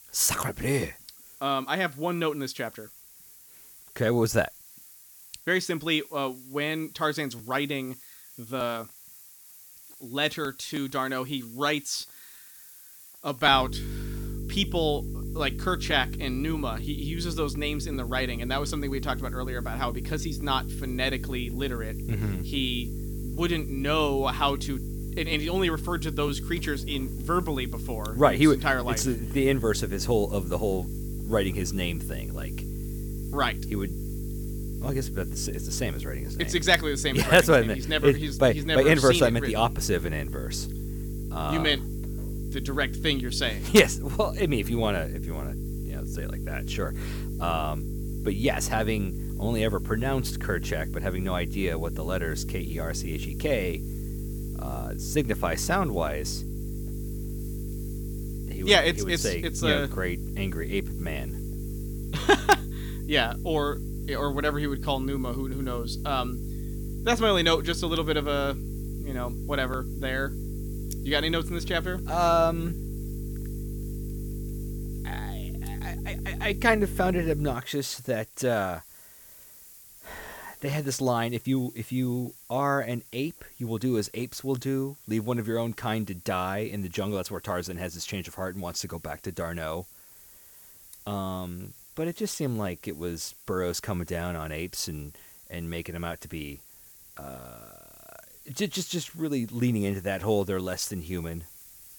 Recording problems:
electrical hum; noticeable; from 14 s to 1:18; 50 Hz, 15 dB below the speech
hiss; noticeable; throughout; 20 dB below the speech

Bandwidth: 18.5 kHz